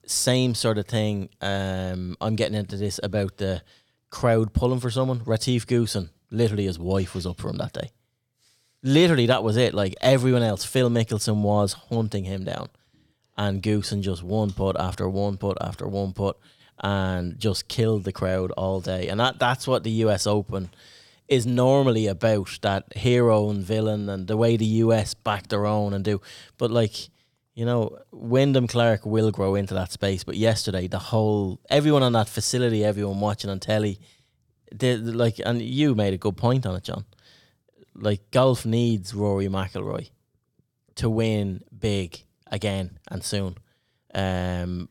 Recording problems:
none

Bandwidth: 18 kHz